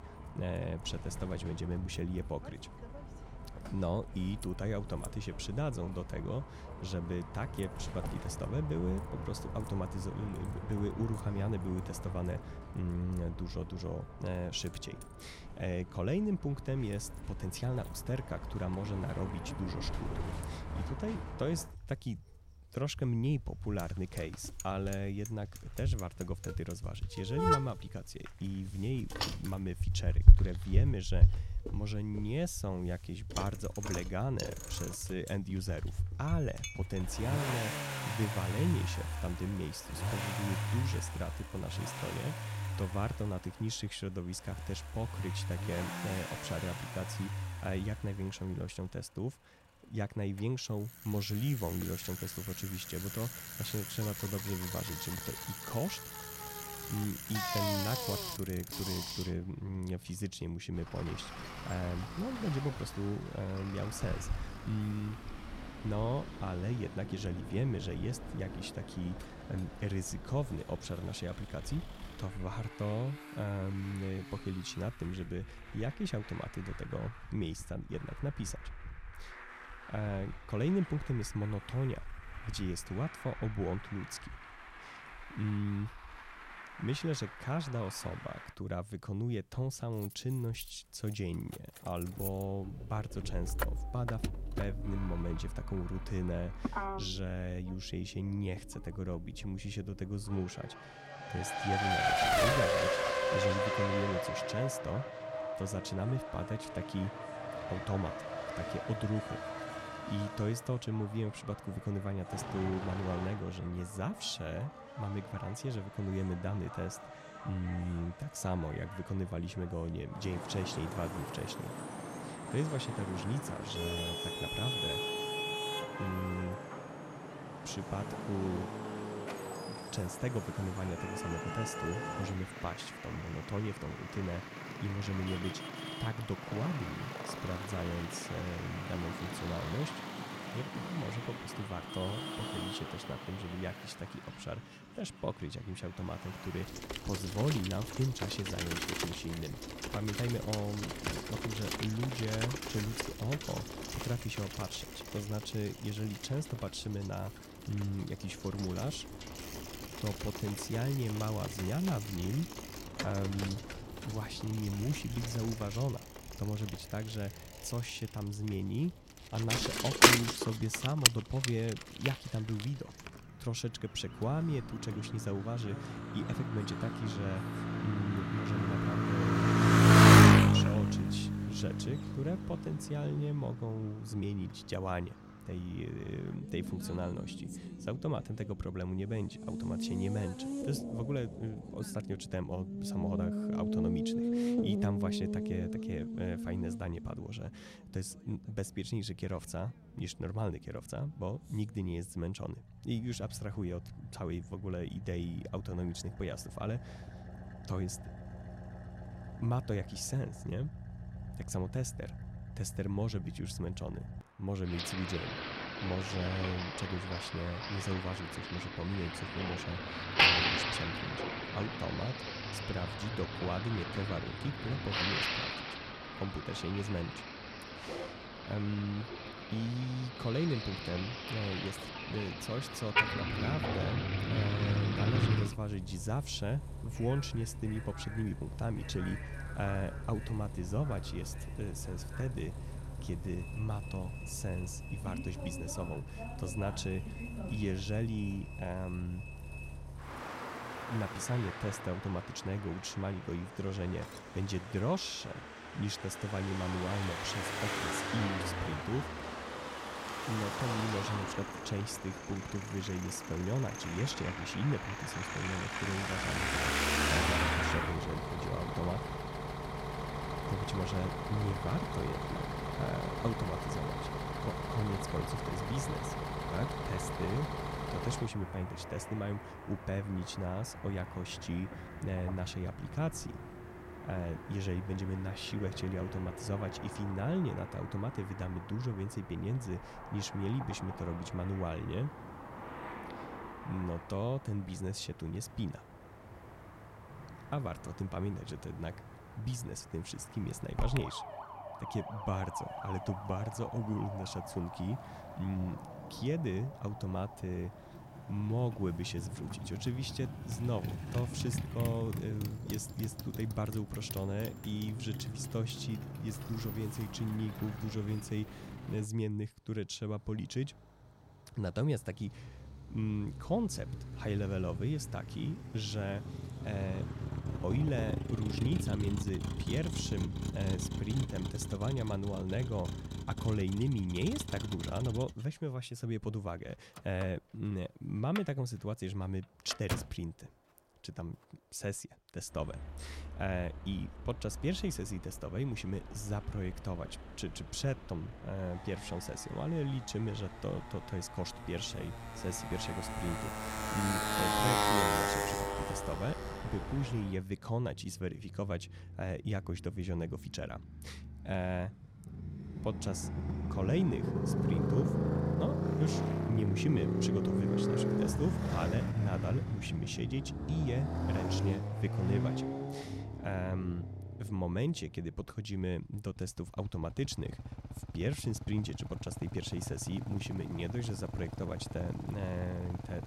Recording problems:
traffic noise; very loud; throughout; 1 dB above the speech

